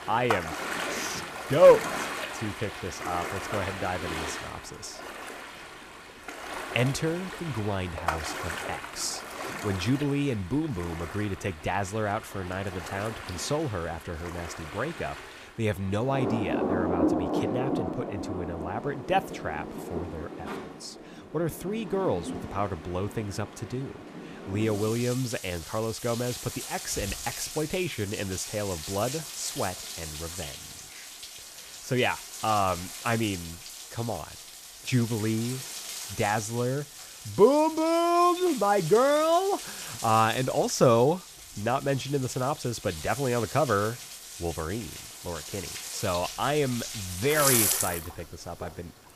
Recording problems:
rain or running water; loud; throughout; 6 dB below the speech

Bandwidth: 15 kHz